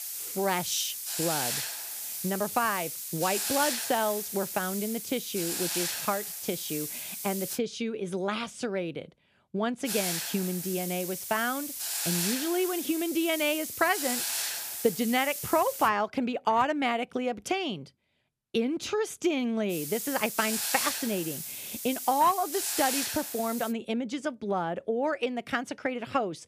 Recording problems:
hiss; loud; until 7.5 s, from 10 to 16 s and from 20 to 24 s; 2 dB below the speech

